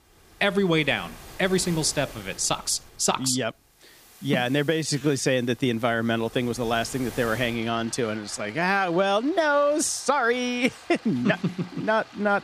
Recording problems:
rain or running water; noticeable; throughout; 20 dB below the speech
uneven, jittery; strongly; from 1.5 to 9.5 s

